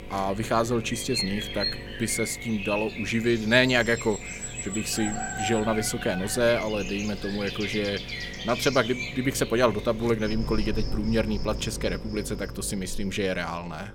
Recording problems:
animal sounds; loud; throughout; 7 dB below the speech
electrical hum; faint; throughout; 50 Hz, 20 dB below the speech

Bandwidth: 16.5 kHz